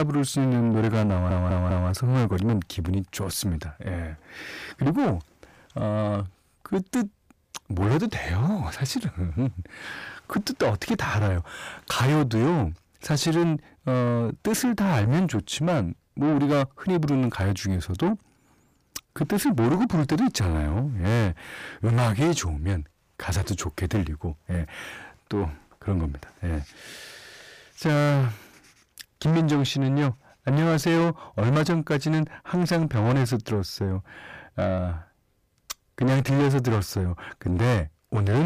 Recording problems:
distortion; heavy; 6 dB below the speech
abrupt cut into speech; at the start and the end
audio stuttering; at 1 s

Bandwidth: 15 kHz